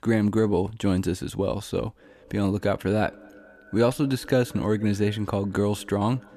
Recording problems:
echo of what is said; faint; from 2 s on; 220 ms later, 25 dB below the speech

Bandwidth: 14.5 kHz